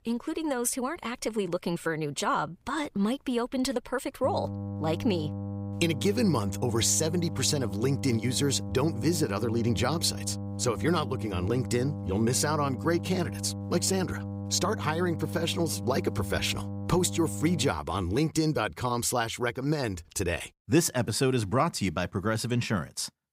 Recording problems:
electrical hum; noticeable; from 4 to 18 s; 50 Hz, 15 dB below the speech

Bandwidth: 15.5 kHz